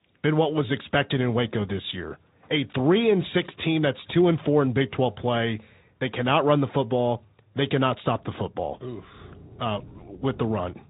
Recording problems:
high frequencies cut off; severe; nothing above 3.5 kHz
garbled, watery; slightly
animal sounds; faint; throughout; 25 dB below the speech

